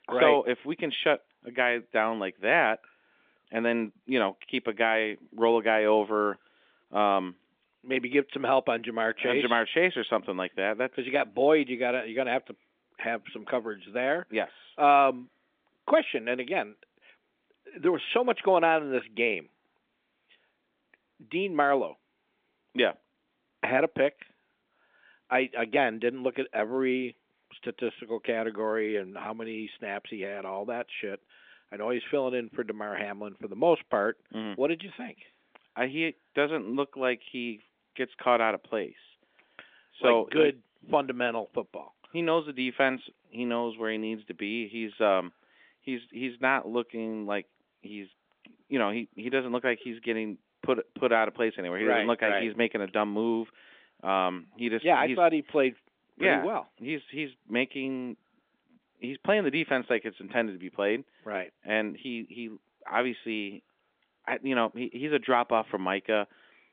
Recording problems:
phone-call audio; nothing above 3 kHz

